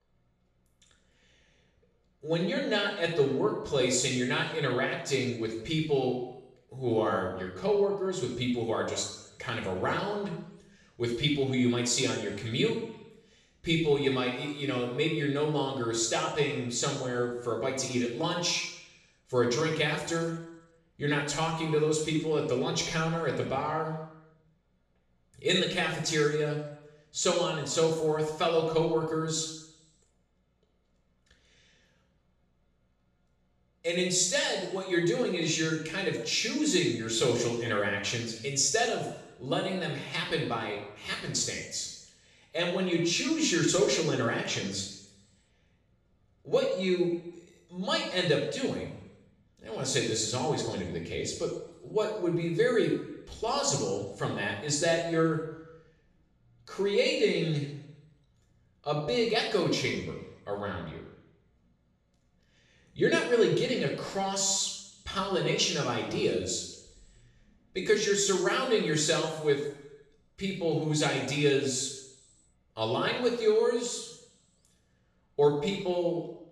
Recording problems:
off-mic speech; far
room echo; noticeable; dies away in 0.8 s

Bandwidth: 13.5 kHz